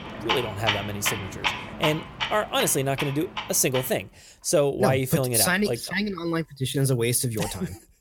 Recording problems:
household noises; loud; throughout; 5 dB below the speech

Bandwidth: 17 kHz